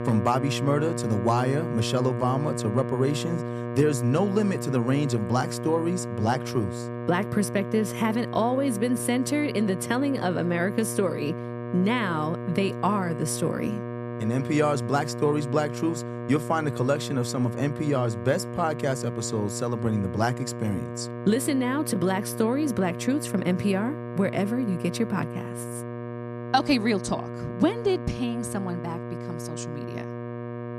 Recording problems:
electrical hum; loud; throughout; 60 Hz, 8 dB below the speech

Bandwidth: 14 kHz